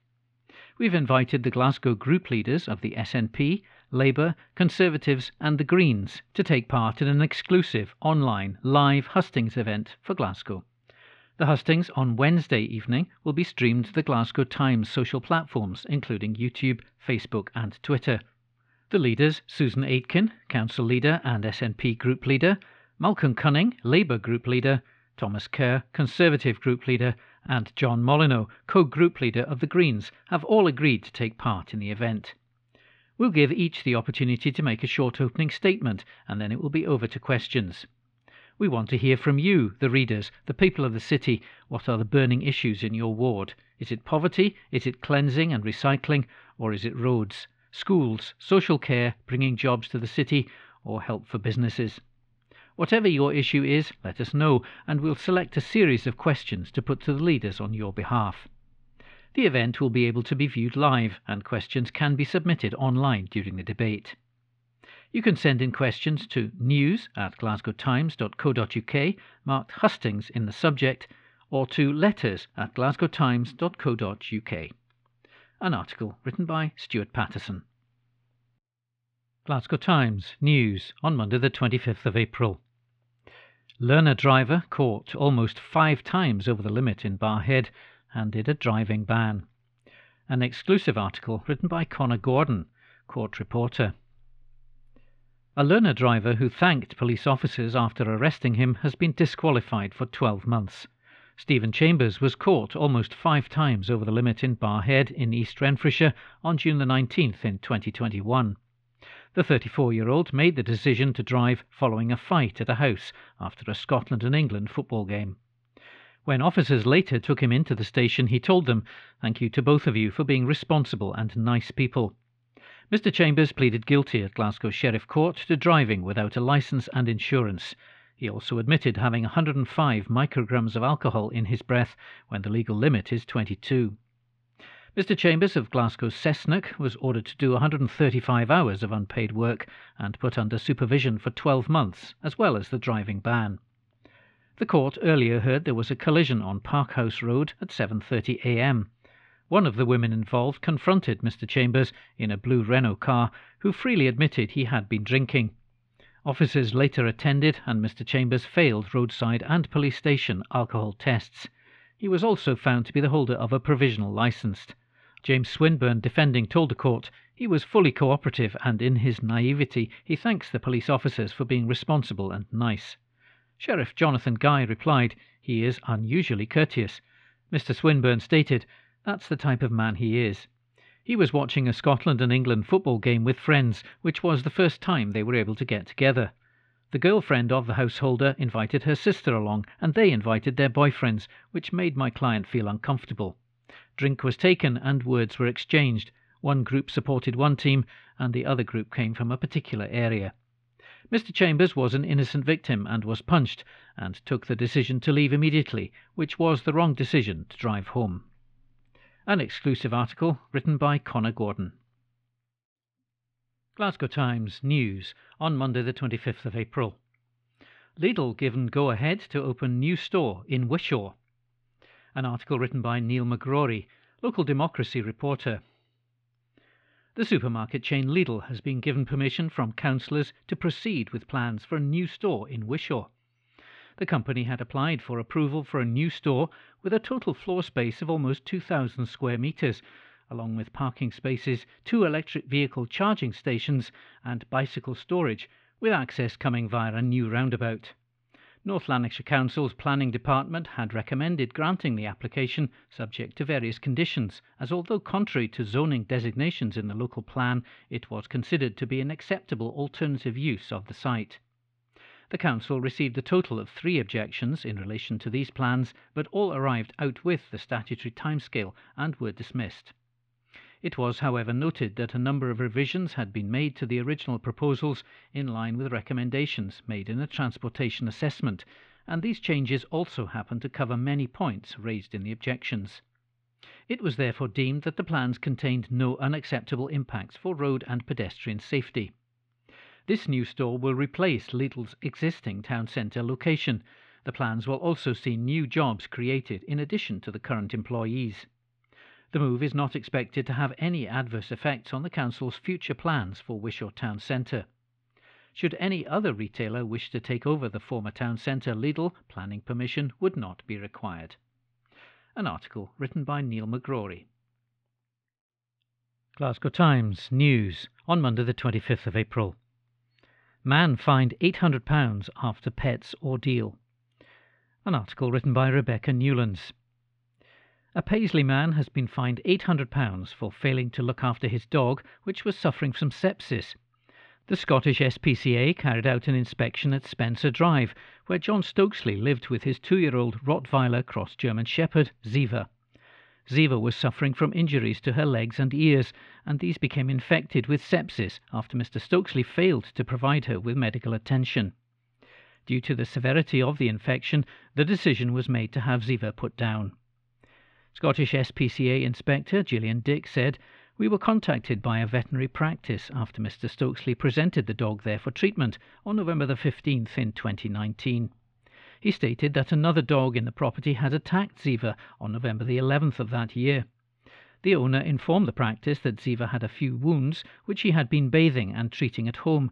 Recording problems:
muffled; slightly; fading above 3 kHz

